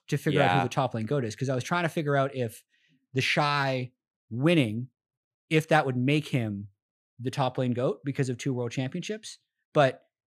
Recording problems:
none

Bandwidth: 14 kHz